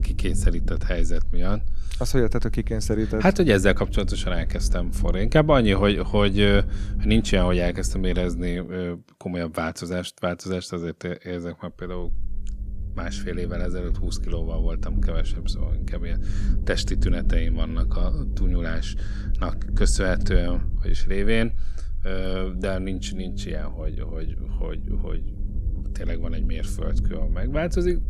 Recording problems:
low rumble; noticeable; until 8.5 s and from 12 s on; 15 dB below the speech

